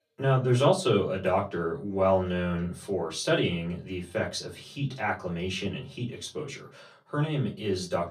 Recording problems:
off-mic speech; far
room echo; very slight; dies away in 0.2 s

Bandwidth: 15 kHz